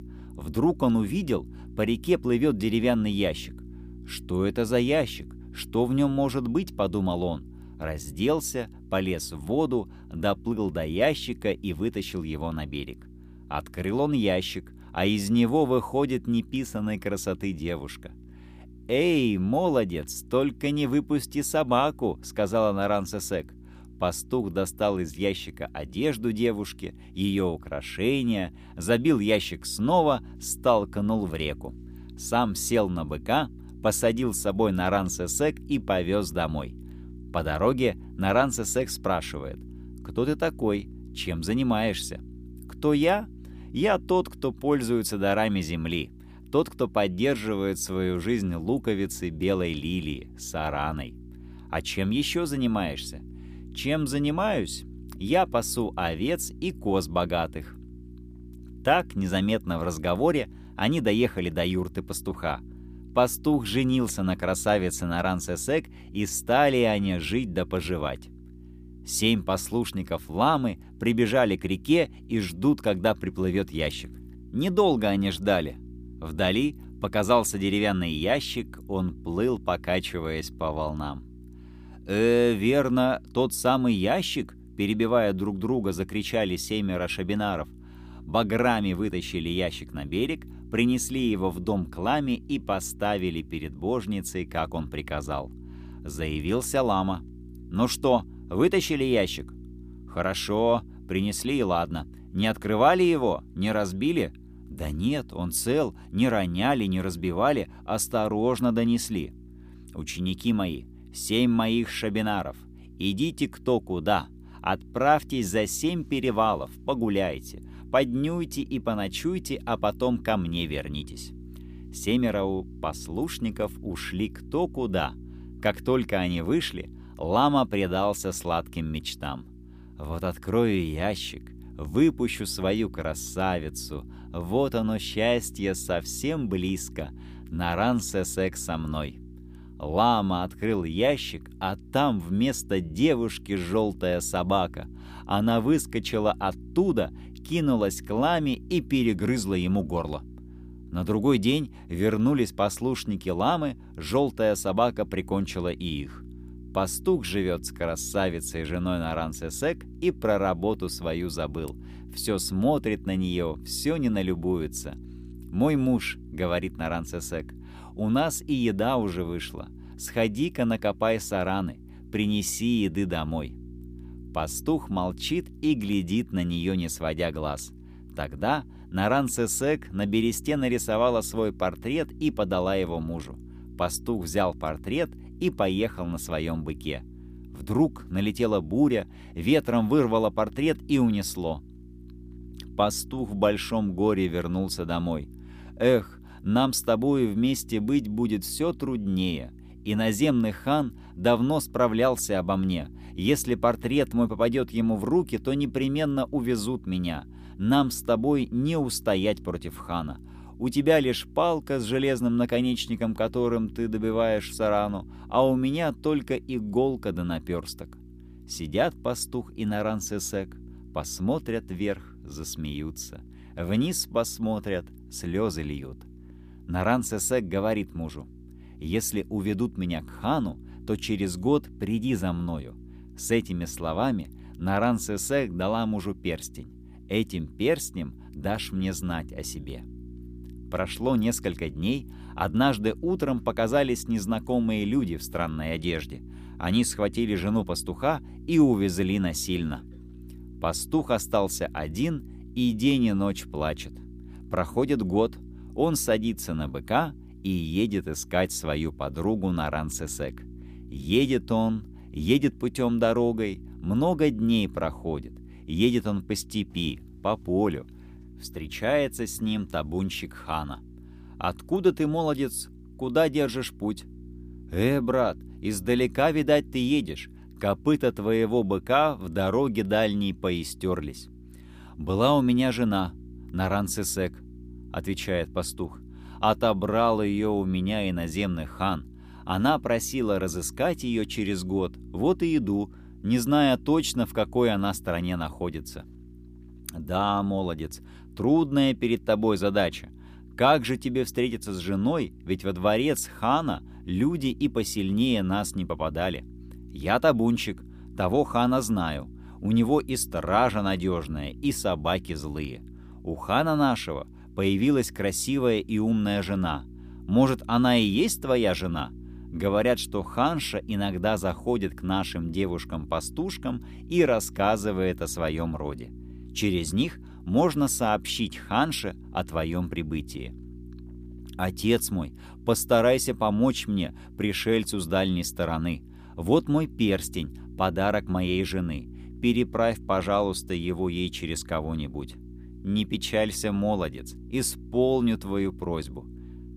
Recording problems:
electrical hum; faint; throughout; 60 Hz, 25 dB below the speech

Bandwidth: 15 kHz